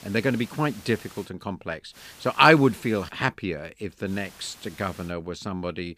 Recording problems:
hiss; faint; until 1.5 s, from 2 to 3 s and from 4 to 5 s; 20 dB below the speech

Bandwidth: 15 kHz